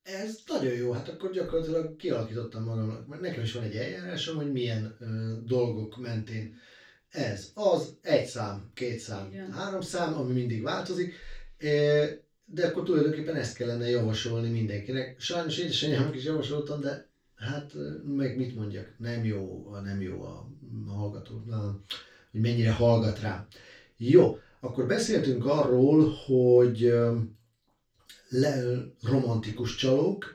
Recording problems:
off-mic speech; far
room echo; noticeable; dies away in 0.2 s

